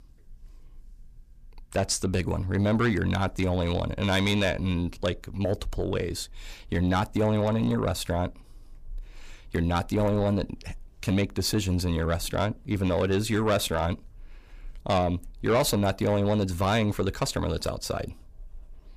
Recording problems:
distortion; slight; 10 dB below the speech

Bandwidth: 15 kHz